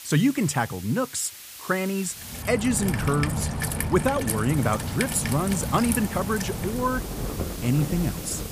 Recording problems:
rain or running water; loud; from 2.5 s on; 4 dB below the speech
hiss; noticeable; until 2.5 s and from 4.5 s on; 15 dB below the speech

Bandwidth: 15 kHz